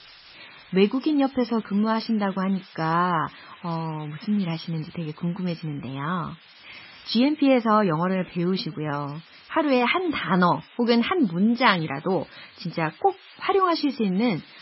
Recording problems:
garbled, watery; badly; nothing above 5.5 kHz
hiss; faint; throughout; 20 dB below the speech

